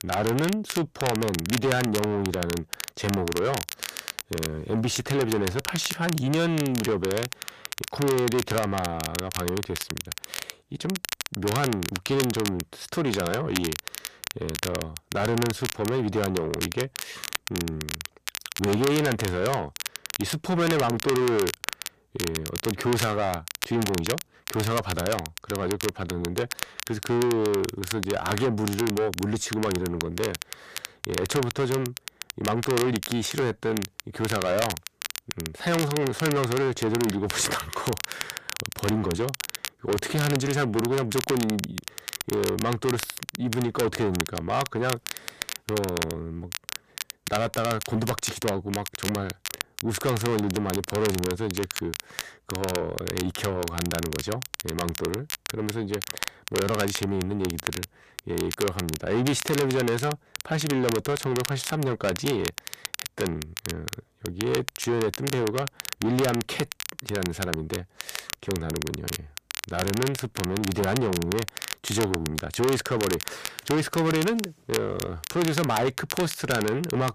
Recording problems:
distortion; heavy; 7 dB below the speech
crackle, like an old record; loud; 6 dB below the speech

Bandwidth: 14.5 kHz